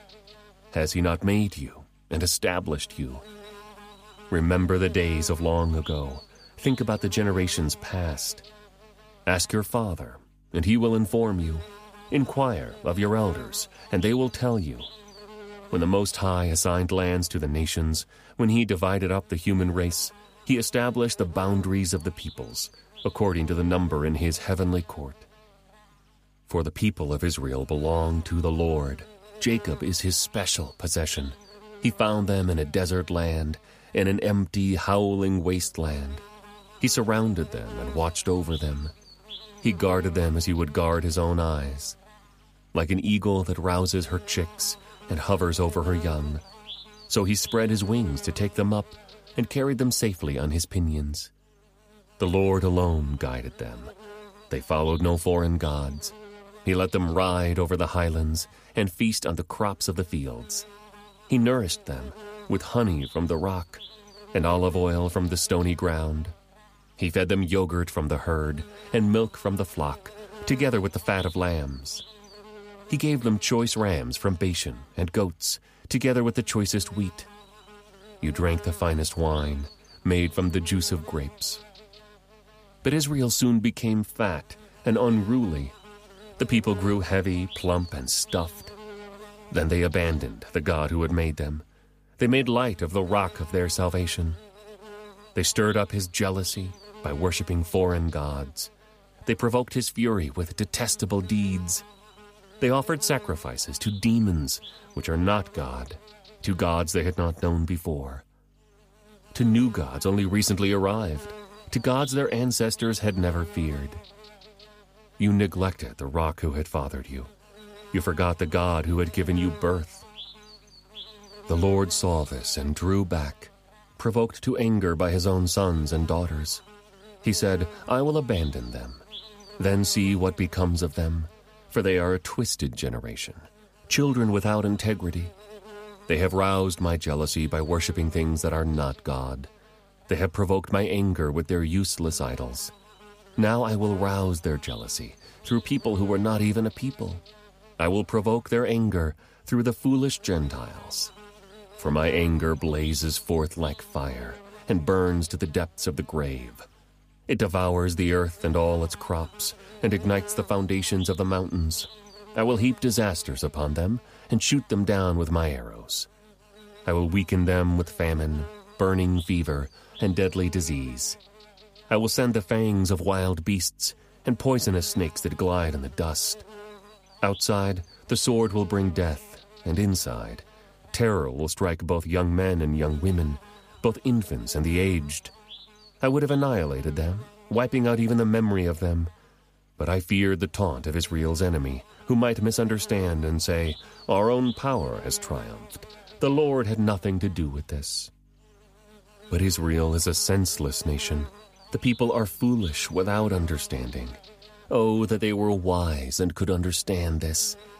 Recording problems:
electrical hum; noticeable; throughout; 50 Hz, 20 dB below the speech

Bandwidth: 15 kHz